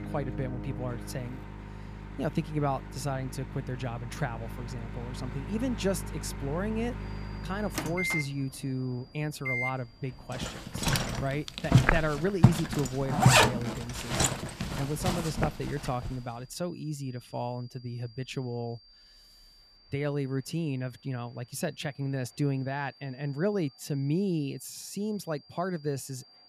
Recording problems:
household noises; very loud; until 16 s; 4 dB above the speech
high-pitched whine; faint; from 7 s on; 4.5 kHz, 25 dB below the speech
train or aircraft noise; faint; throughout; 25 dB below the speech

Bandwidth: 14.5 kHz